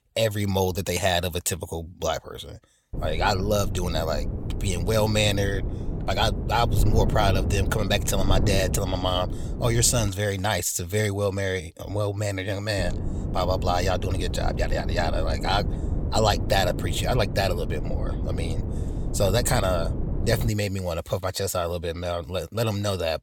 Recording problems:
wind noise on the microphone; occasional gusts; from 3 to 10 s and from 13 to 20 s; 10 dB below the speech

